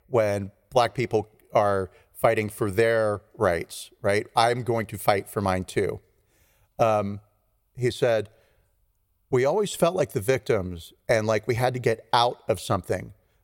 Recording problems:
none

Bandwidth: 16.5 kHz